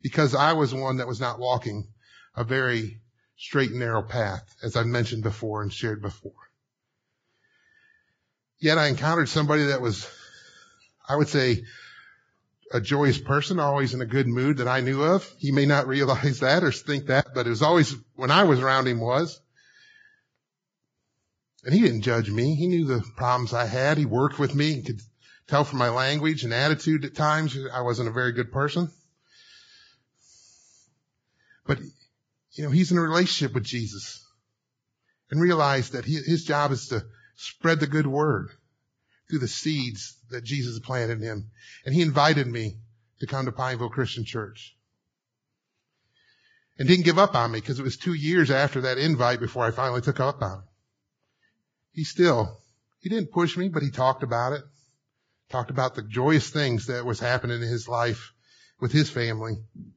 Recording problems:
garbled, watery; badly; nothing above 7.5 kHz

